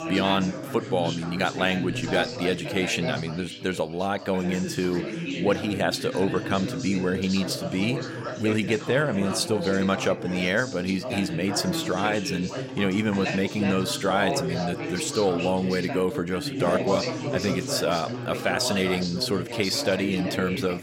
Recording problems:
background chatter; loud; throughout; 3 voices, 5 dB below the speech

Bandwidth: 16 kHz